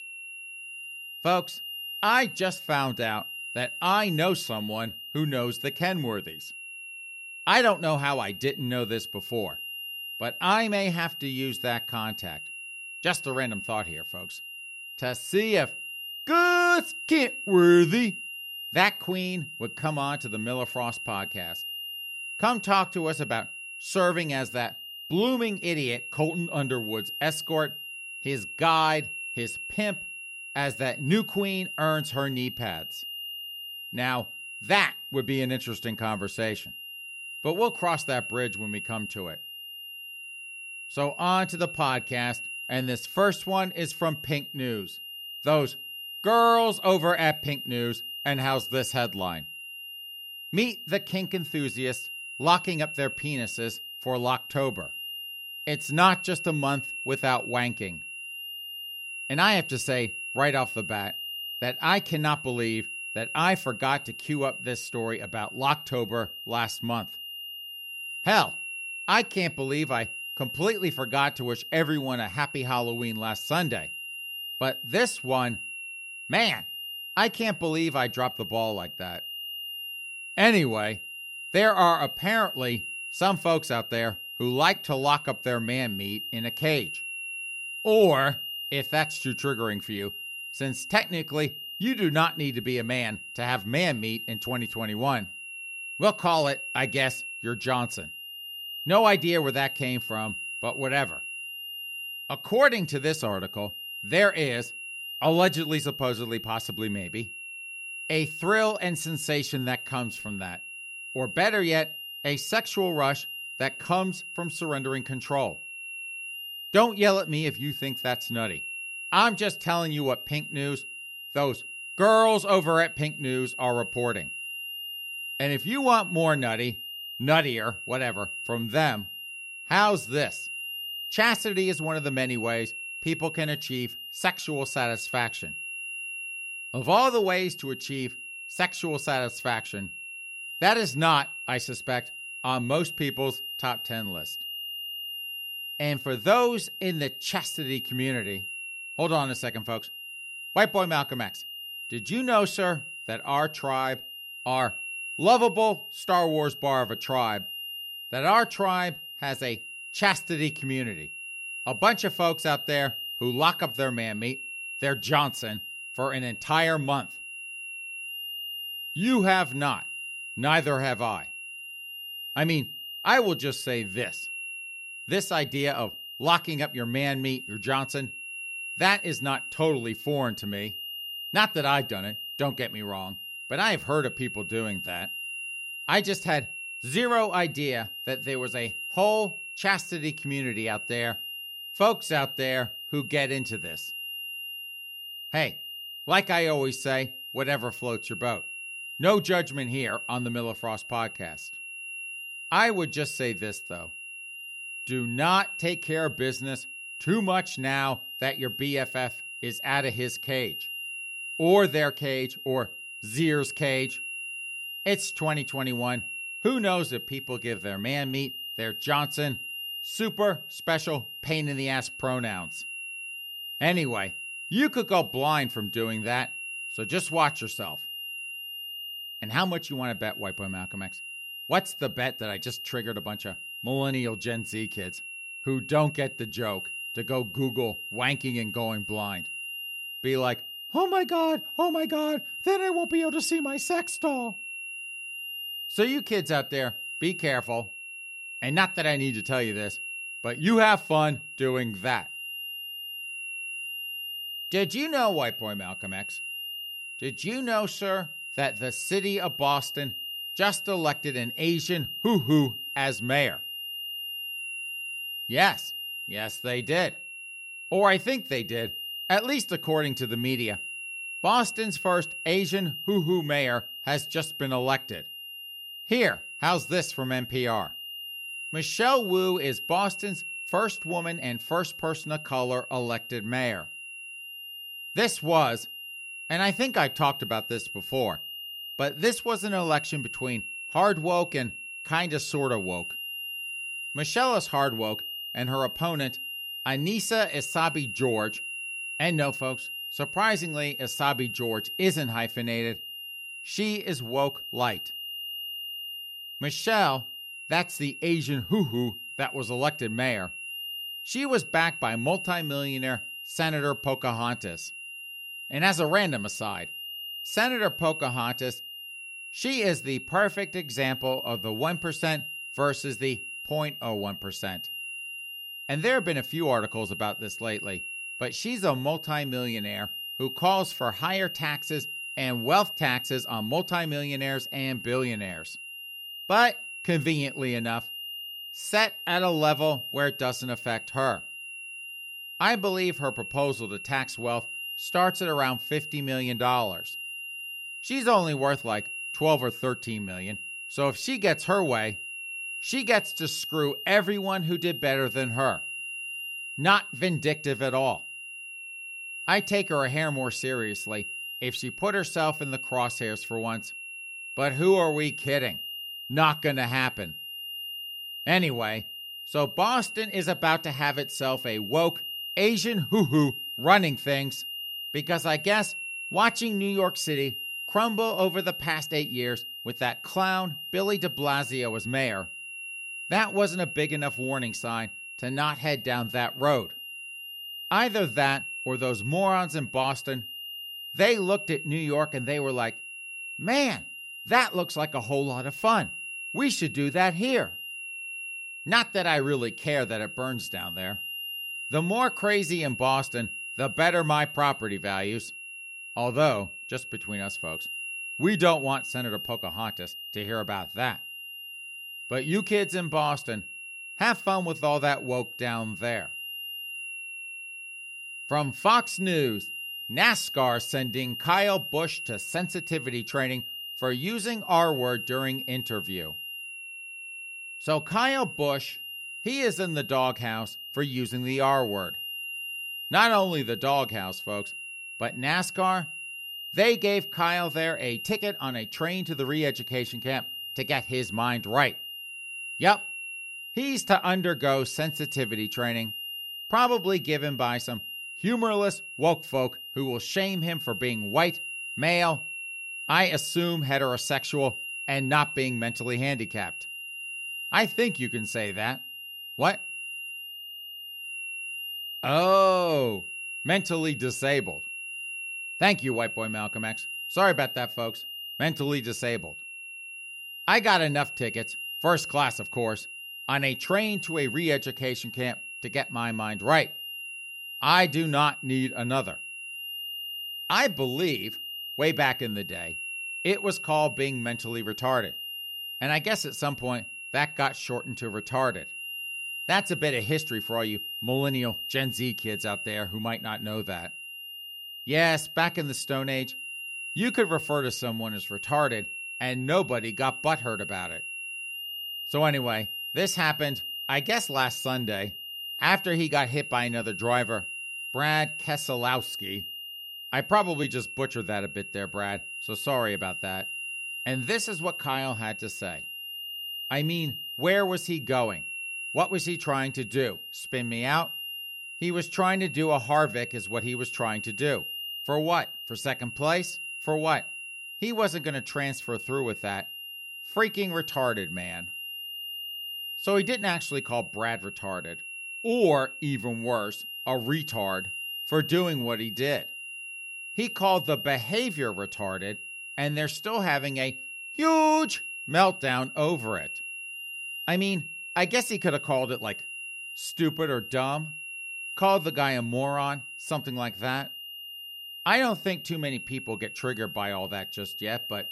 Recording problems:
high-pitched whine; loud; throughout; 3 kHz, 8 dB below the speech

